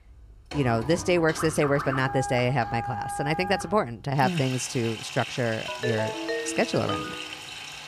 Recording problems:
household noises; loud; throughout; 9 dB below the speech
phone ringing; noticeable; from 5.5 to 7.5 s; peak 3 dB below the speech

